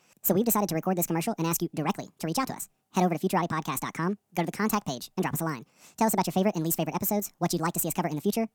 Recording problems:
wrong speed and pitch; too fast and too high; 1.6 times normal speed

